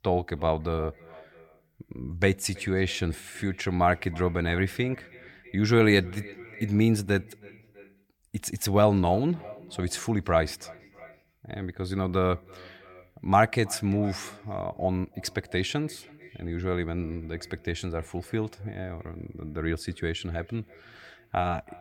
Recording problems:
echo of what is said; faint; throughout; 320 ms later, 20 dB below the speech

